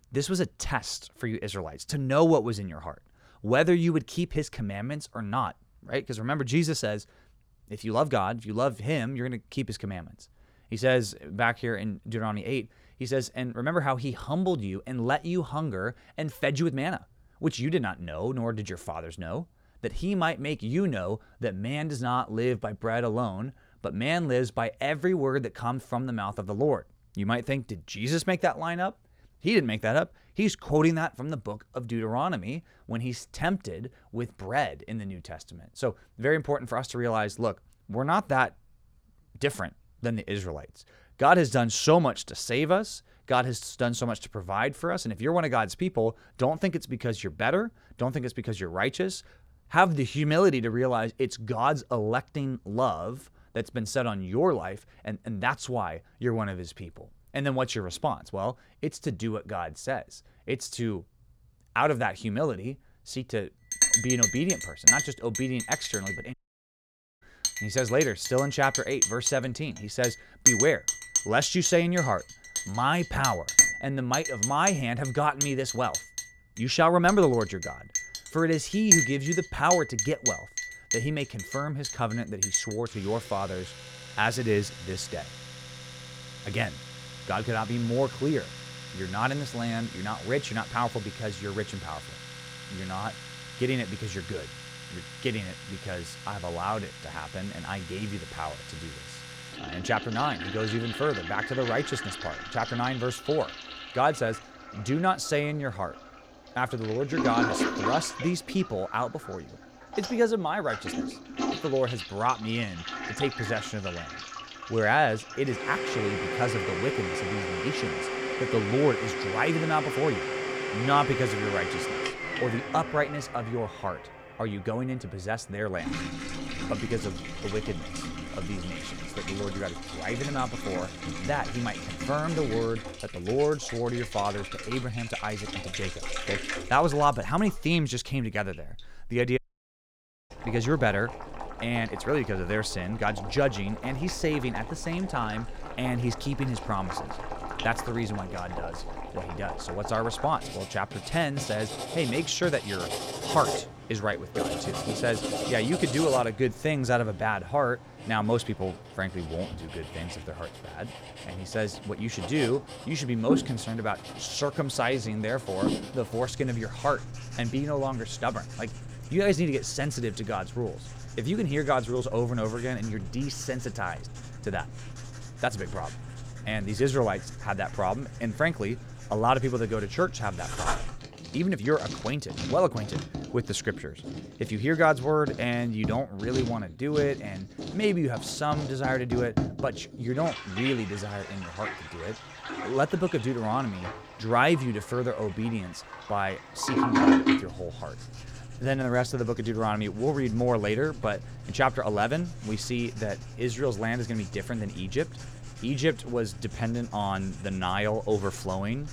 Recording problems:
household noises; loud; from 1:04 on; 4 dB below the speech
audio cutting out; at 1:06 for 1 s and at 2:19 for 1 s

